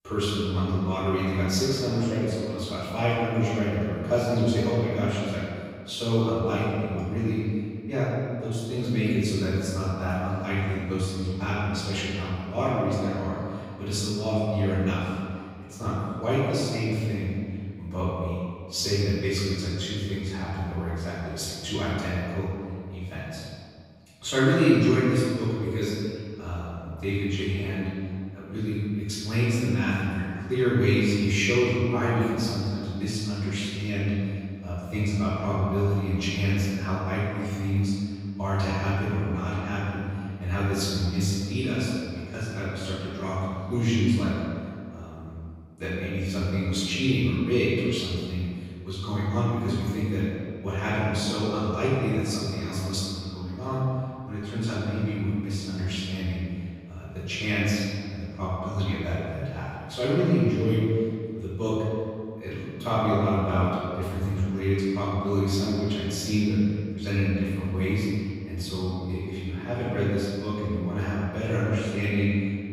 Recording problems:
room echo; strong; dies away in 1.9 s
off-mic speech; far

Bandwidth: 15.5 kHz